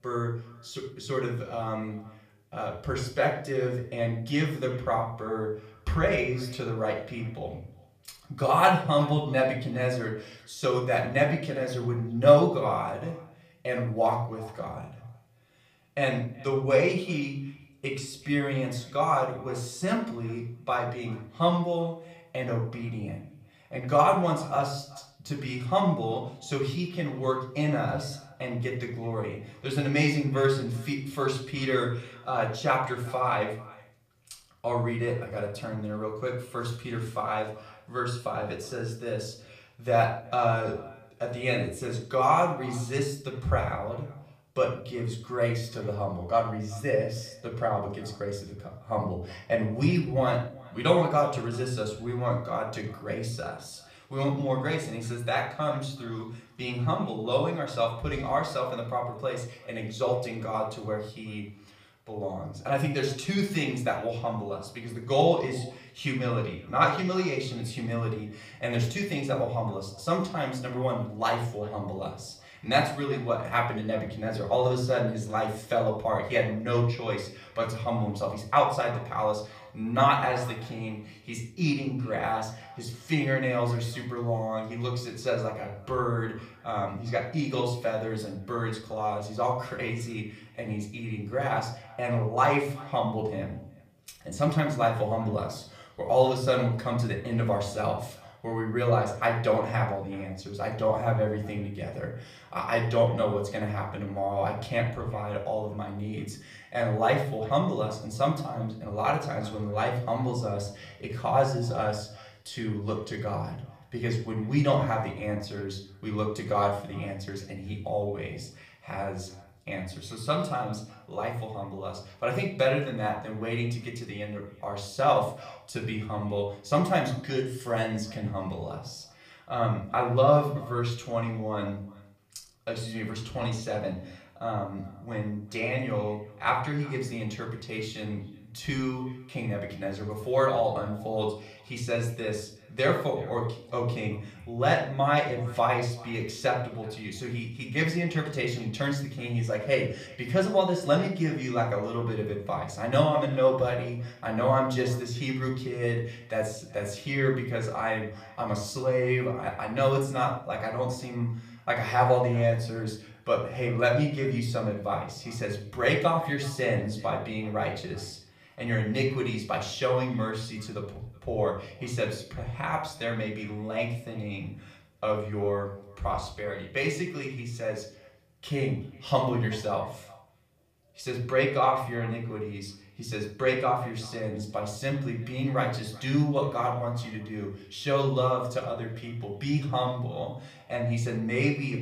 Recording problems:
off-mic speech; far
echo of what is said; faint; throughout; 380 ms later, 25 dB below the speech
room echo; slight; dies away in 0.5 s

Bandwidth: 15 kHz